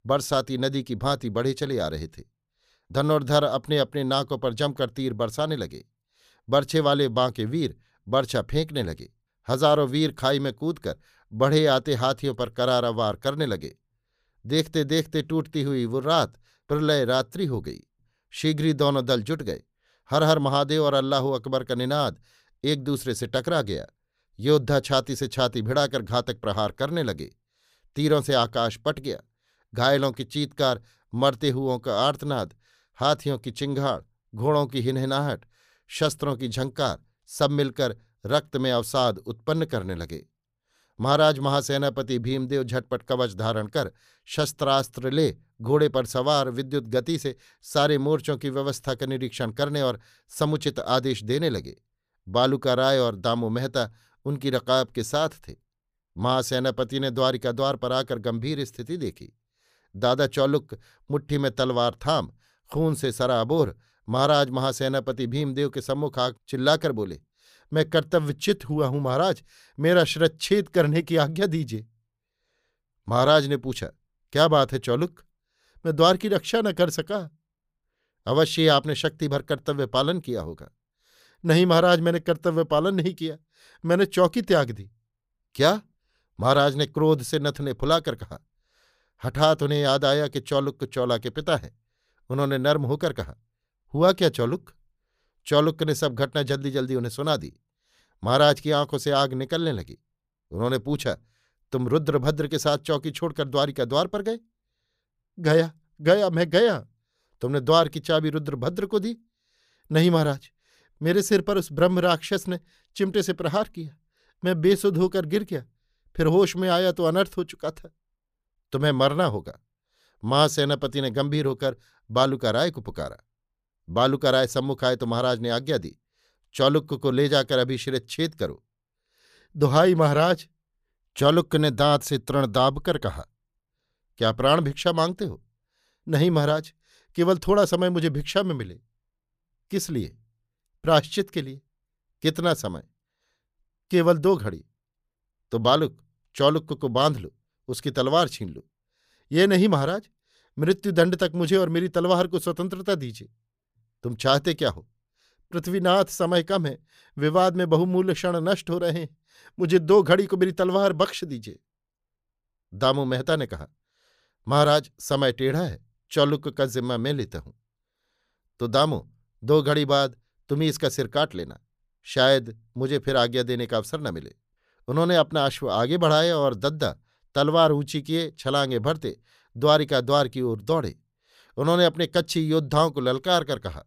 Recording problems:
none

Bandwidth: 15 kHz